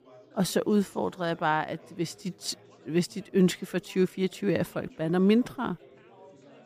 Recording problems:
chatter from many people; faint; throughout; 25 dB below the speech

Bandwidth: 15 kHz